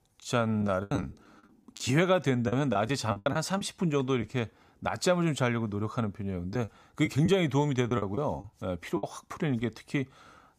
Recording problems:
choppy; very; from 0.5 to 4 s and from 6.5 to 9 s; 12% of the speech affected

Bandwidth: 15 kHz